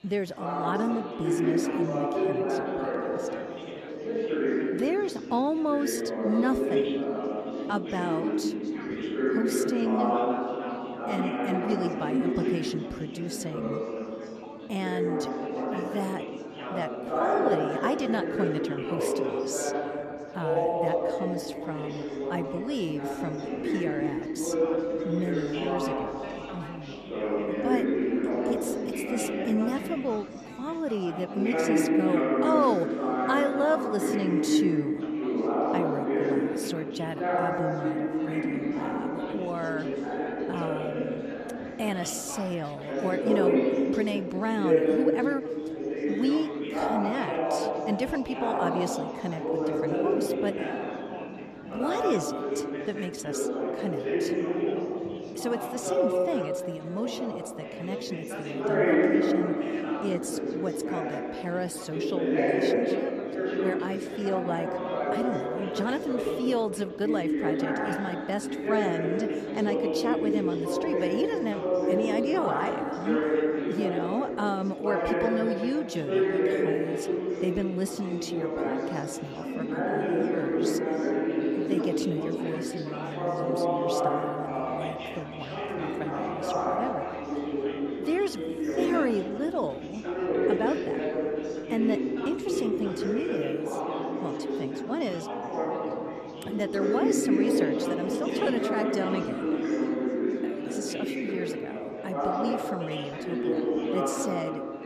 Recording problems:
chatter from many people; very loud; throughout; 4 dB above the speech

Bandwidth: 14 kHz